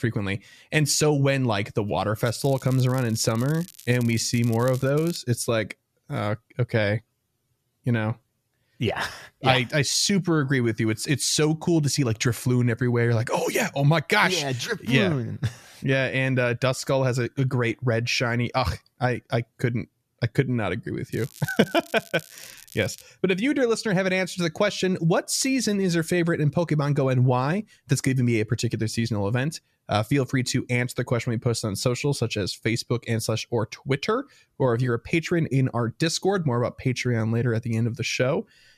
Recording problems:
crackling; noticeable; from 2 to 5 s and from 21 to 23 s; 20 dB below the speech

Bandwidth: 14.5 kHz